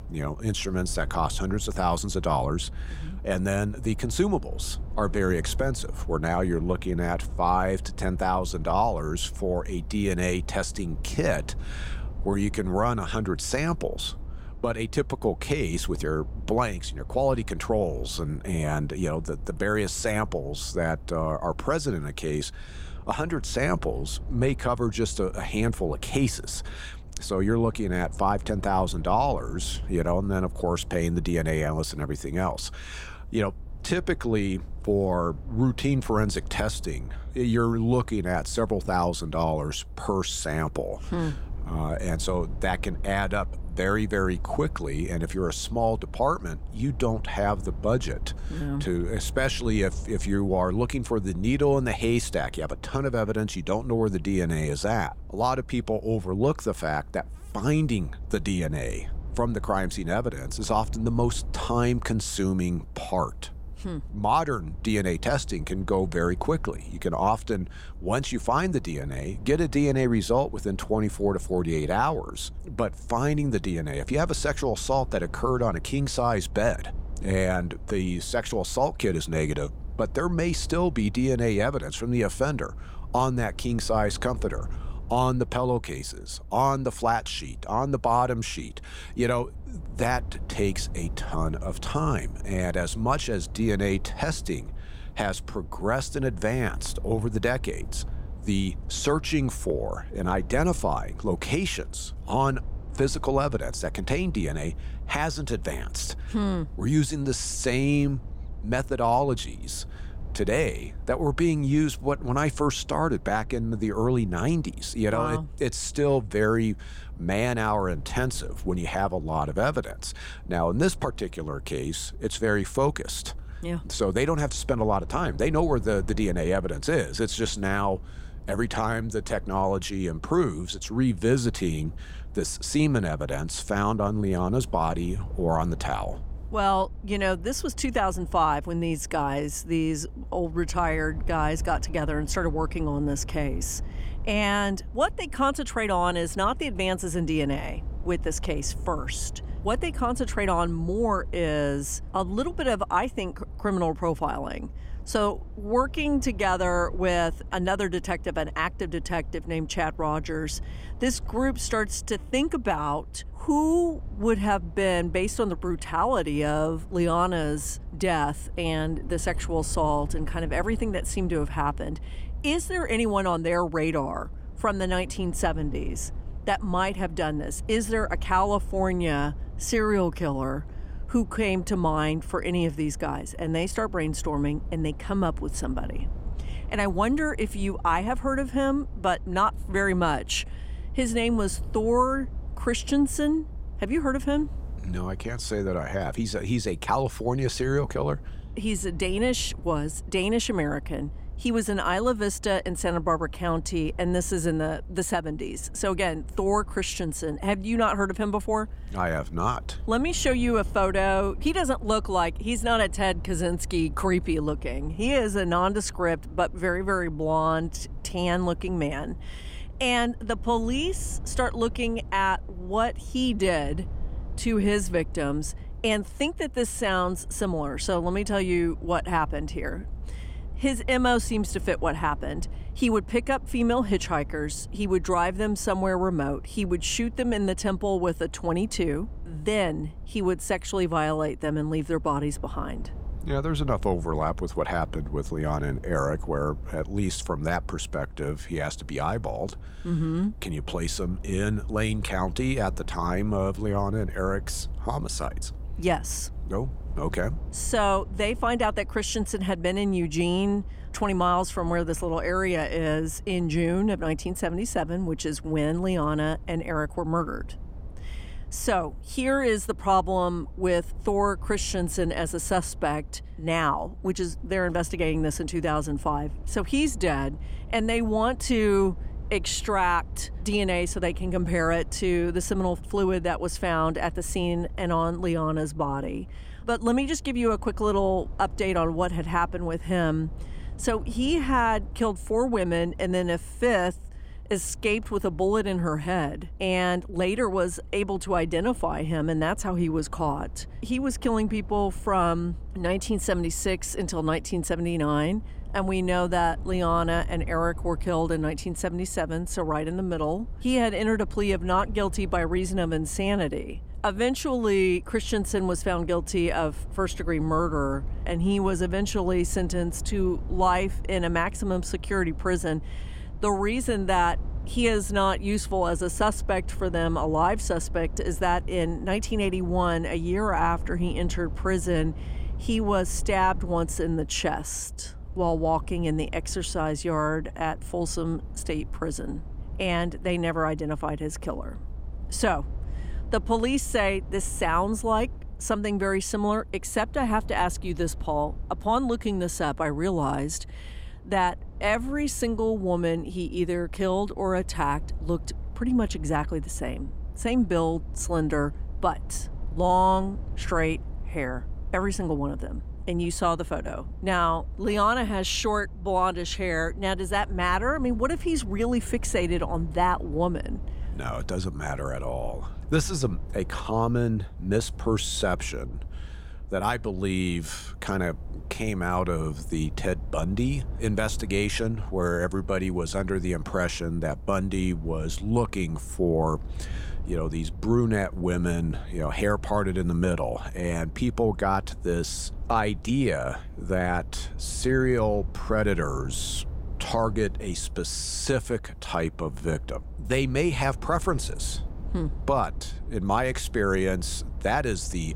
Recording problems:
low rumble; faint; throughout; 25 dB below the speech

